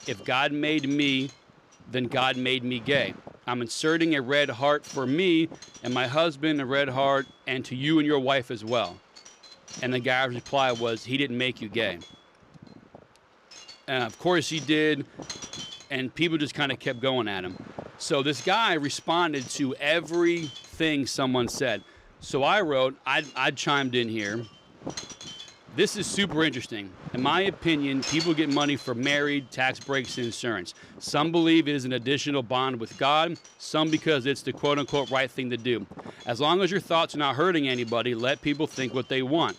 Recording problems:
wind noise on the microphone; occasional gusts; 15 dB below the speech

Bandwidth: 15.5 kHz